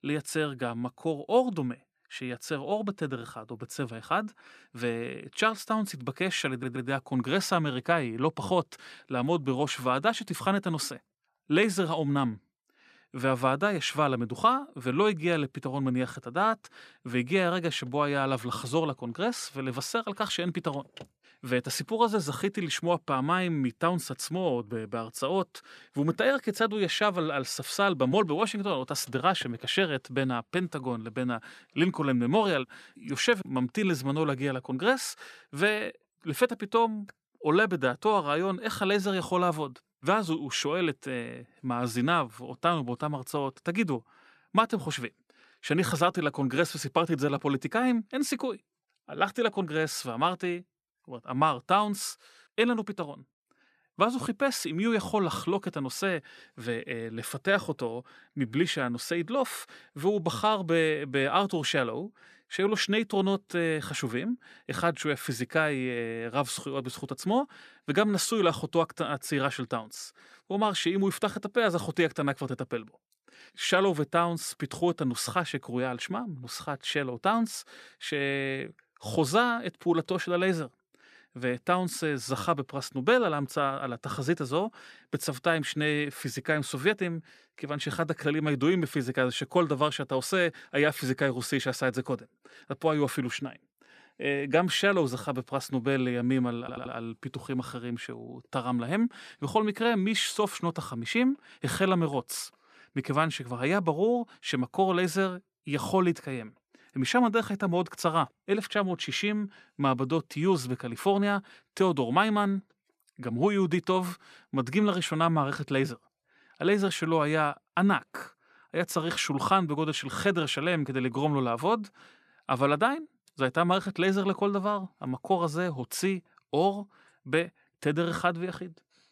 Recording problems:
audio stuttering; at 6.5 s and at 1:37

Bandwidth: 14.5 kHz